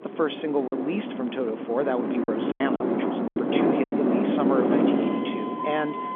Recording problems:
phone-call audio; nothing above 3.5 kHz
traffic noise; very loud; throughout; 3 dB above the speech
choppy; very; 6% of the speech affected

